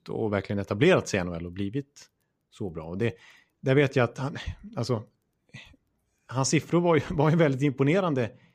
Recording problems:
none

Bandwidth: 15 kHz